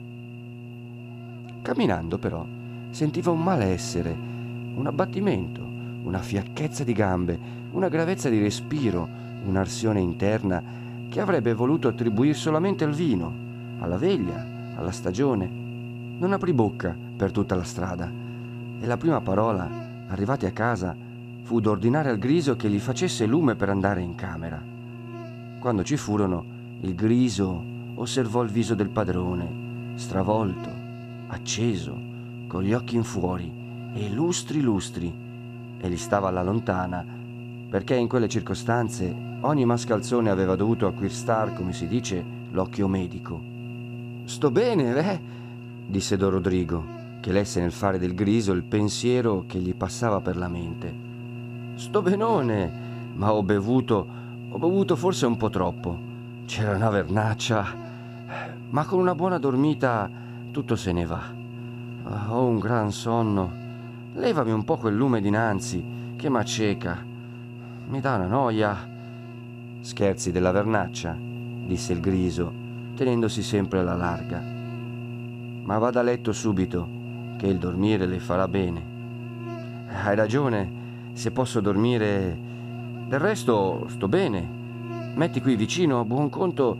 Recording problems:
electrical hum; noticeable; throughout; 60 Hz, 15 dB below the speech

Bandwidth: 14.5 kHz